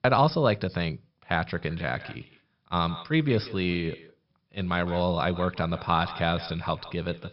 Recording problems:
echo of what is said; noticeable; from 1.5 s on; 160 ms later, 15 dB below the speech
high frequencies cut off; noticeable; nothing above 5.5 kHz

